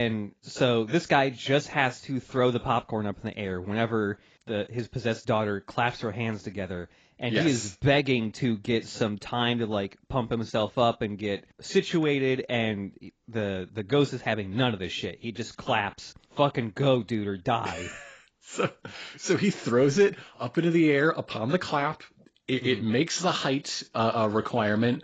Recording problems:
garbled, watery; badly; nothing above 7.5 kHz
abrupt cut into speech; at the start

